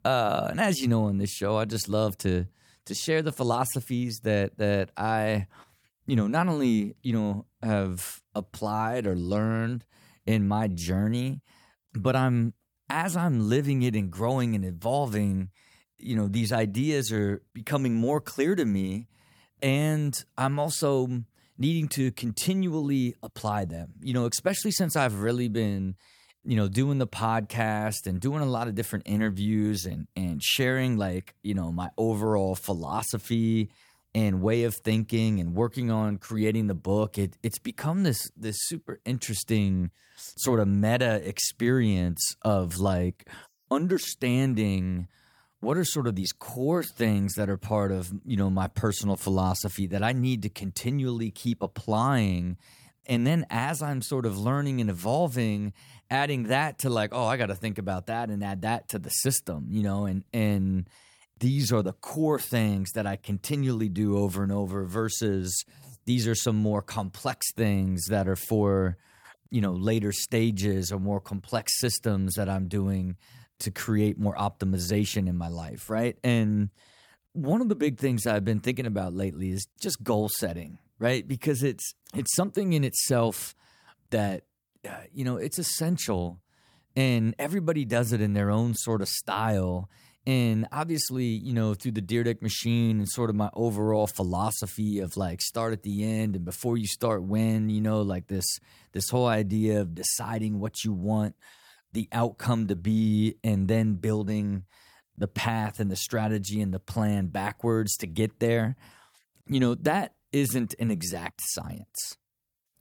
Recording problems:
none

